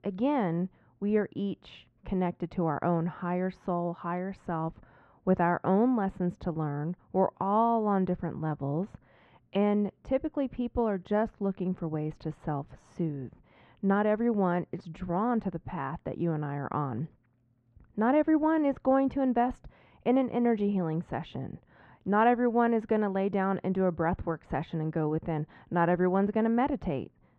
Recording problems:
muffled; very; fading above 1.5 kHz

